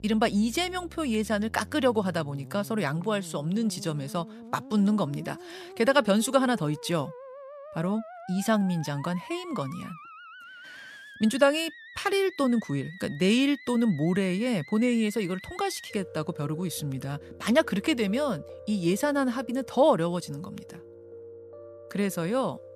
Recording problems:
background music; noticeable; throughout; 20 dB below the speech

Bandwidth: 14.5 kHz